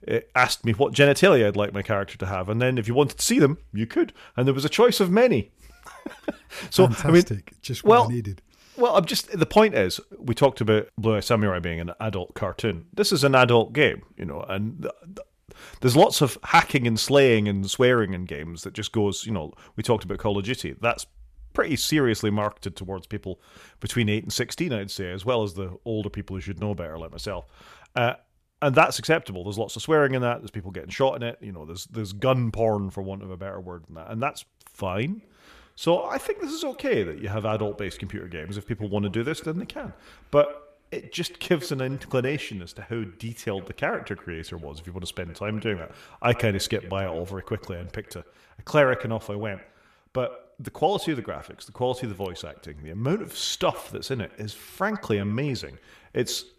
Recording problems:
echo of what is said; faint; from 35 s on; 100 ms later, 20 dB below the speech

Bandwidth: 14.5 kHz